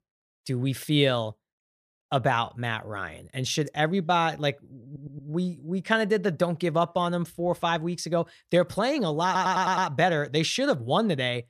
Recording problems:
audio stuttering; at 5 s and at 9.5 s

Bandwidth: 14.5 kHz